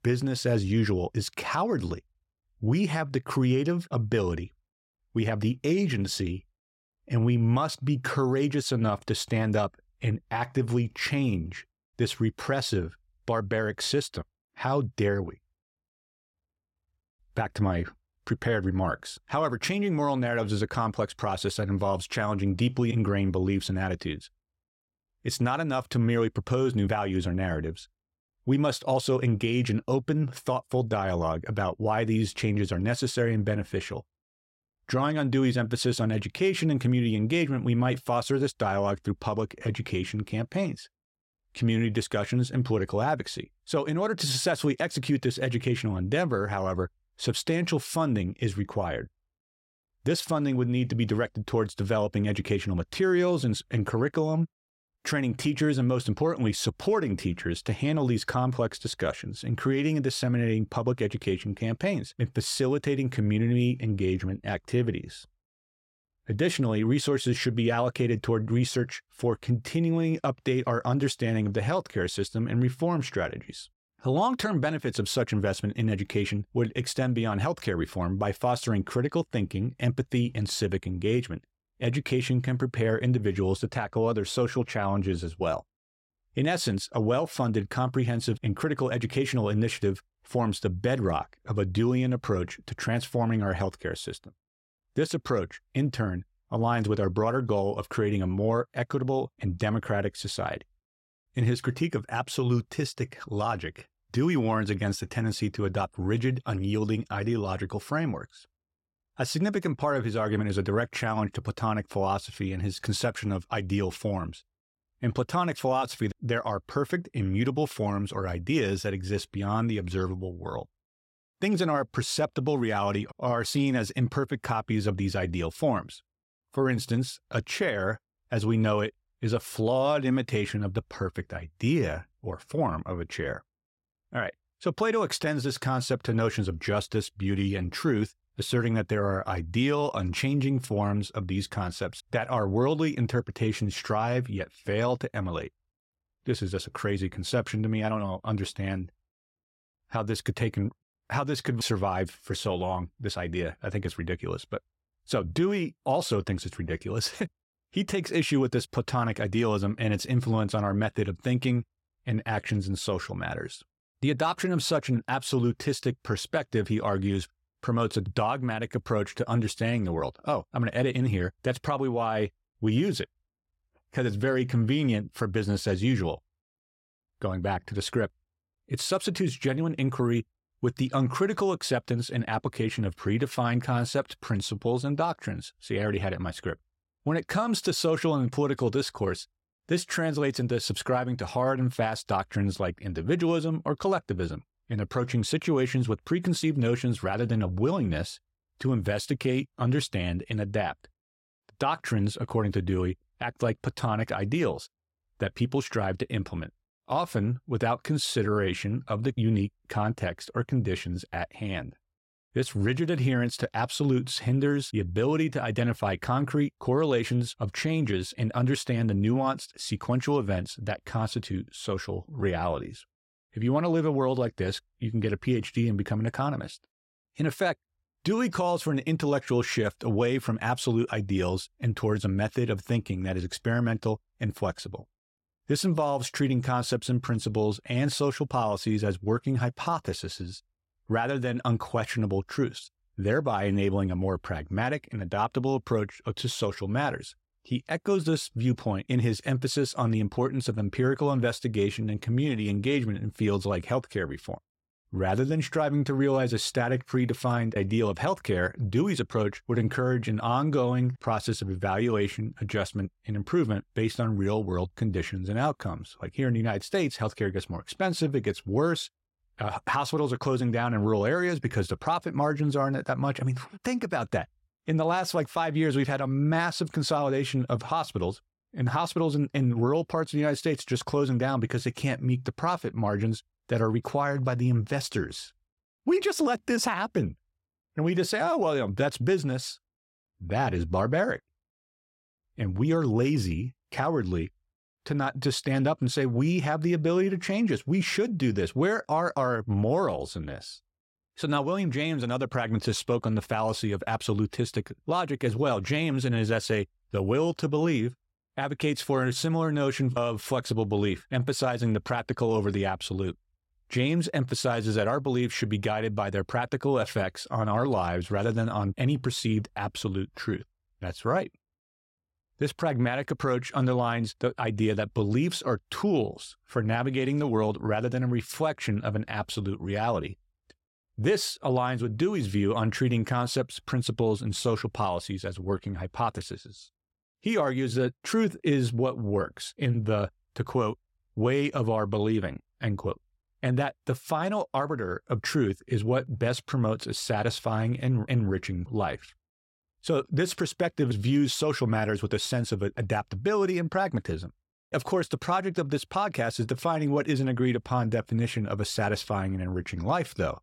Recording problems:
none

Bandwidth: 16 kHz